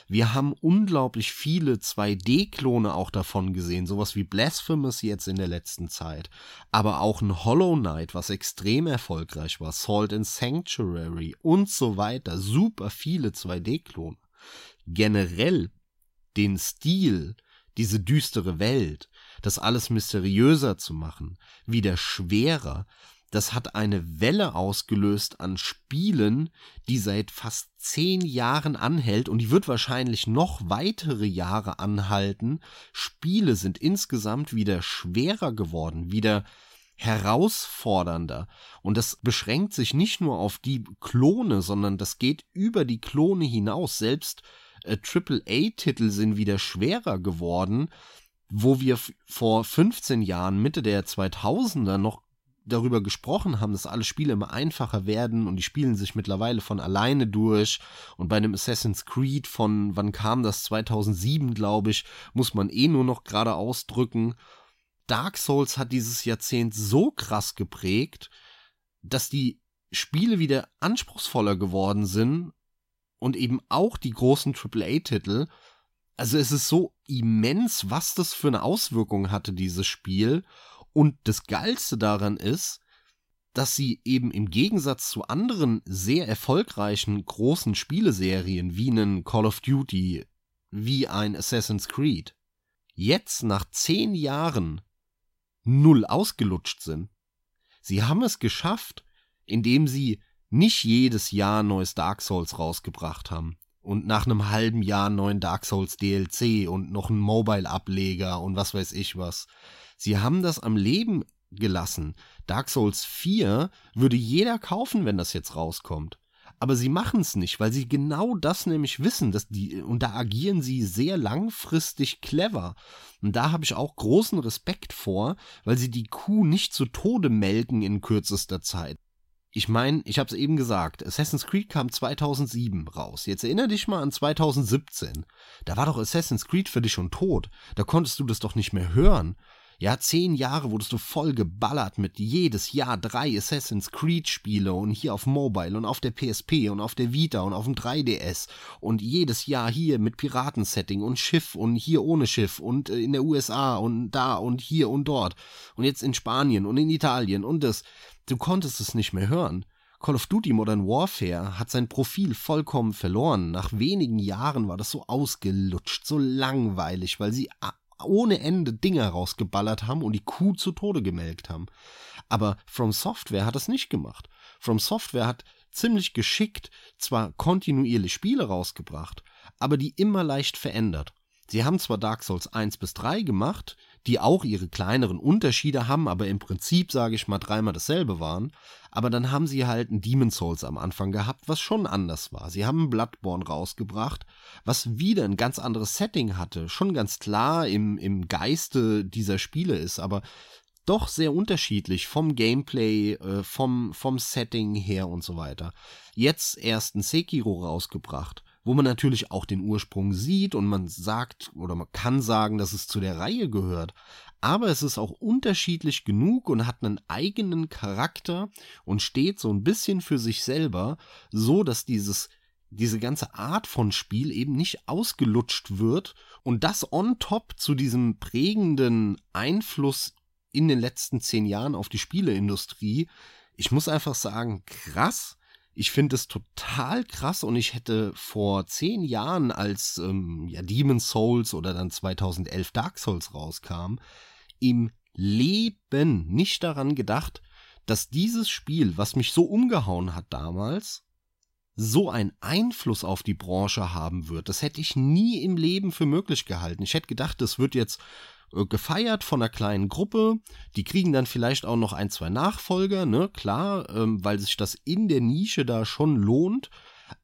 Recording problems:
none

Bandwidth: 16 kHz